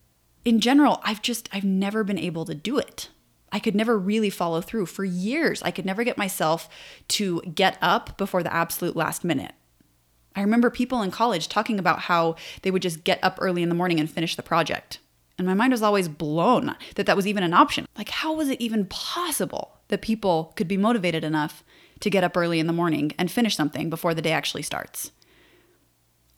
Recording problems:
none

